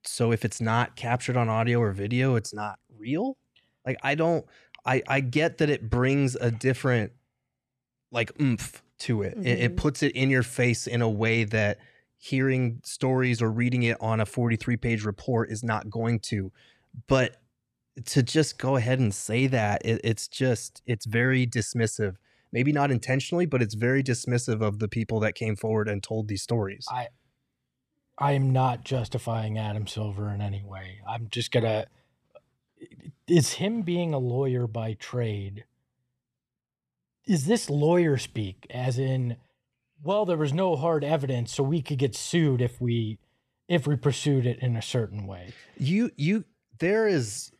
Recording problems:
none

